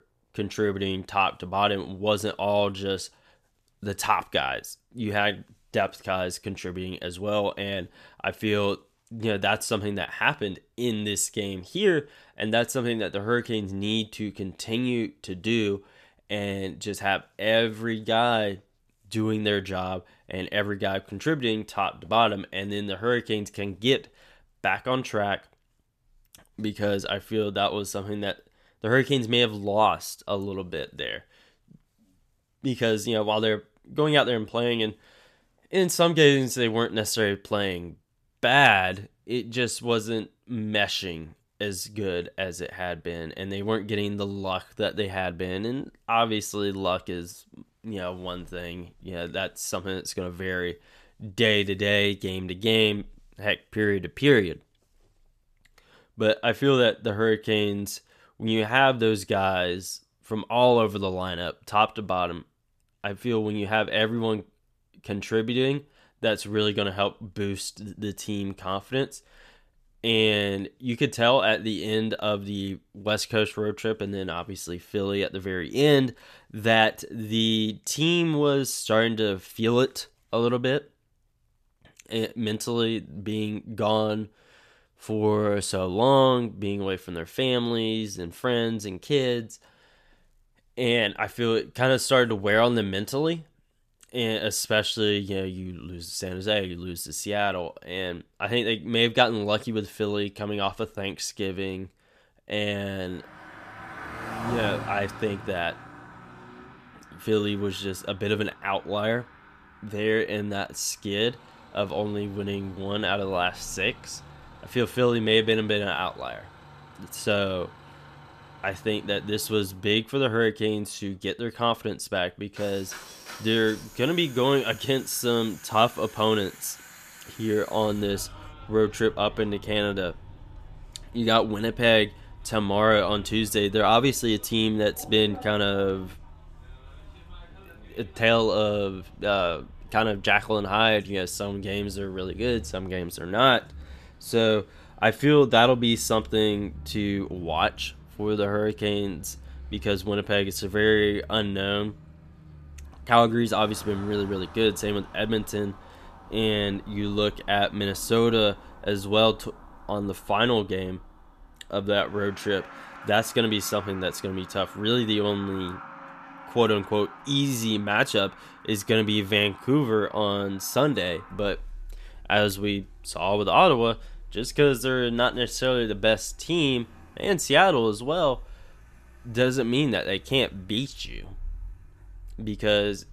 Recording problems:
traffic noise; noticeable; from 1:43 on; 20 dB below the speech

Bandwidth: 14.5 kHz